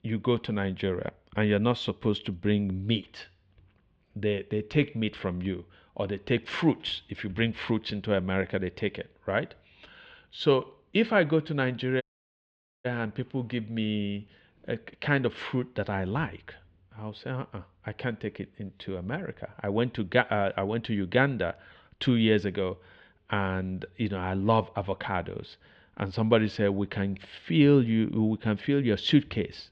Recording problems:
muffled; slightly; fading above 3 kHz
audio cutting out; at 12 s for 1 s

